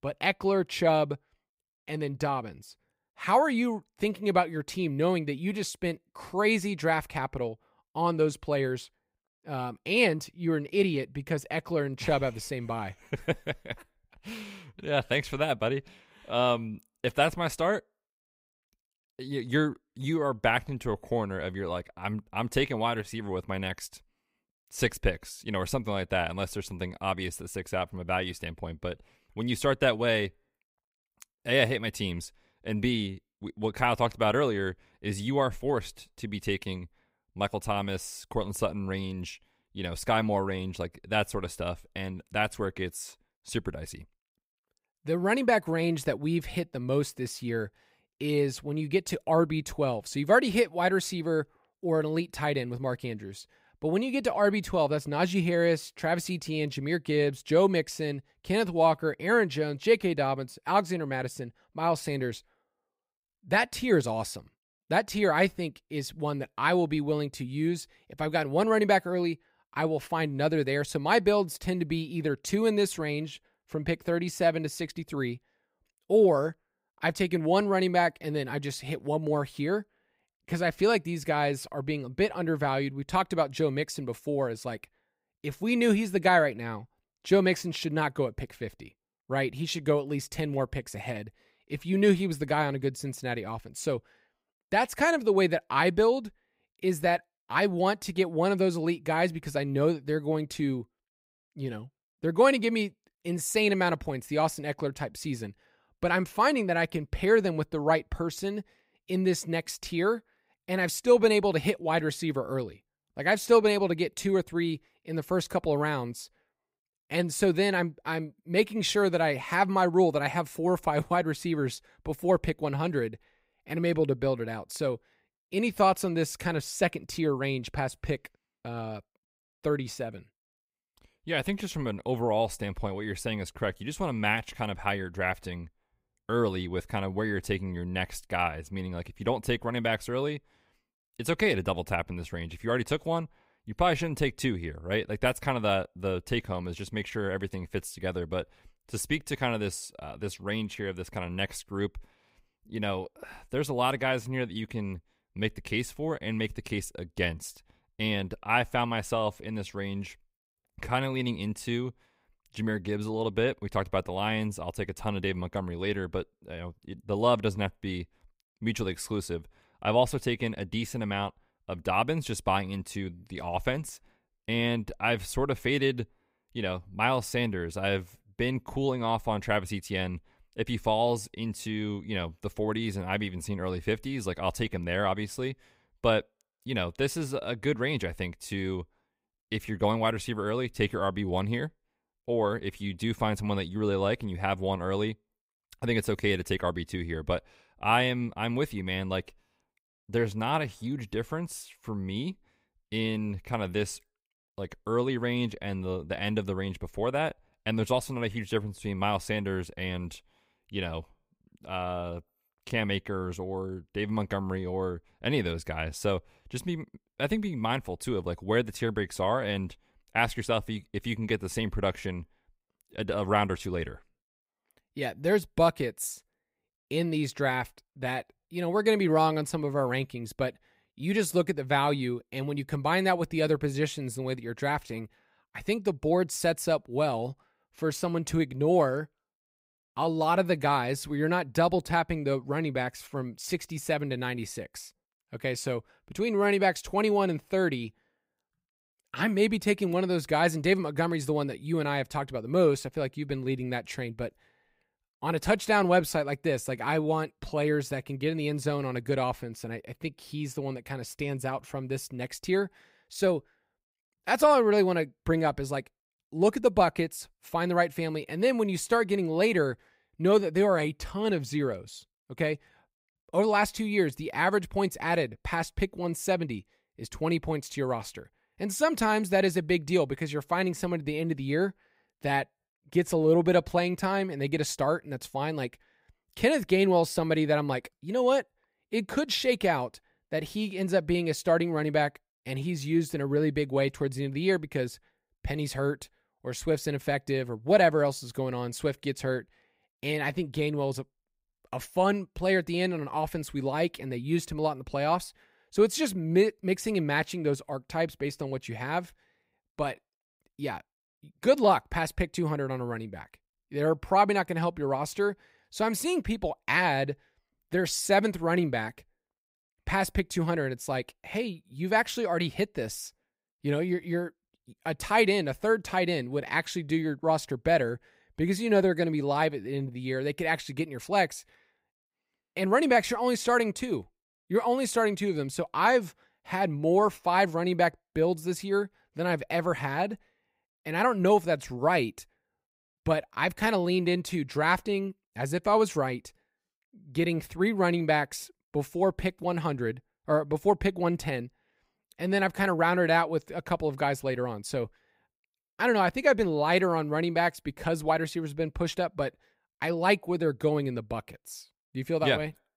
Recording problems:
none

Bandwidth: 15.5 kHz